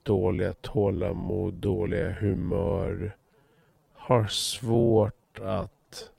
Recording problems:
wrong speed, natural pitch; too slow; 0.6 times normal speed

